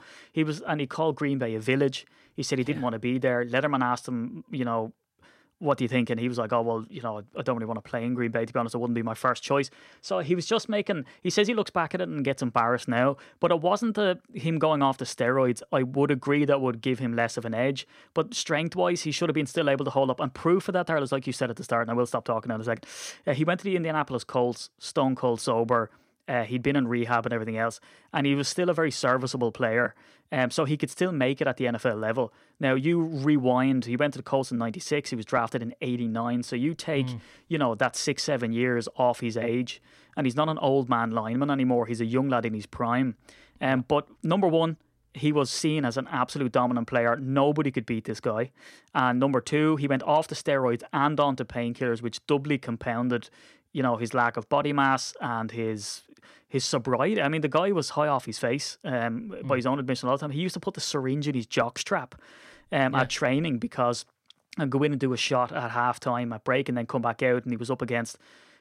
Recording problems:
none

